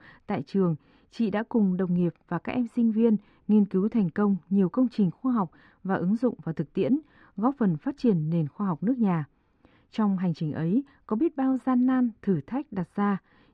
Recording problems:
muffled; very; fading above 1.5 kHz

